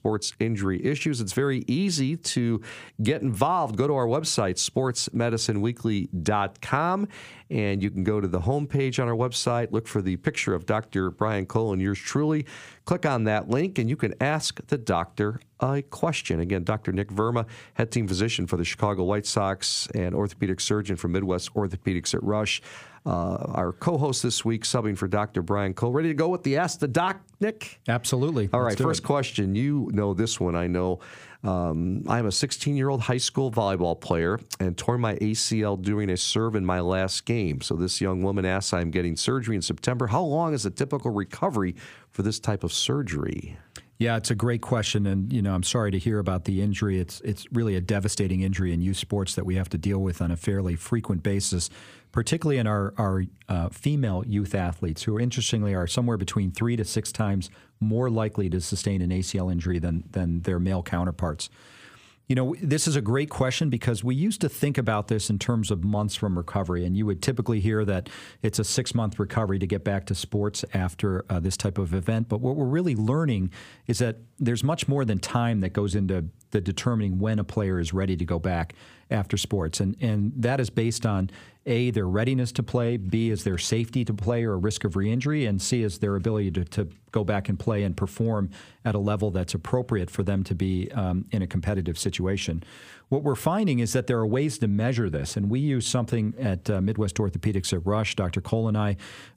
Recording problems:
squashed, flat; somewhat

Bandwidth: 15 kHz